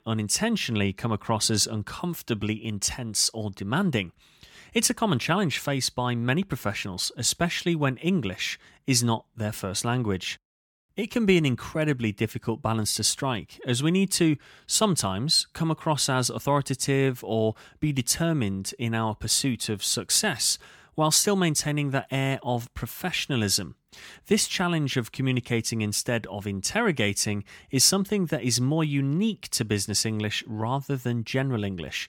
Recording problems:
none

